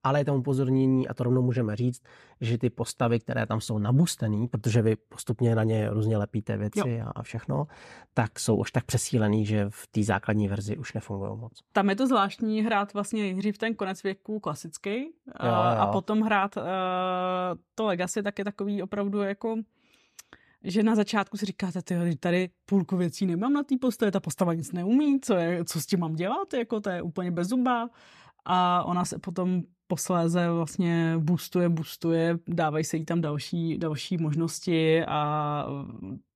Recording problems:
none

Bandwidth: 14.5 kHz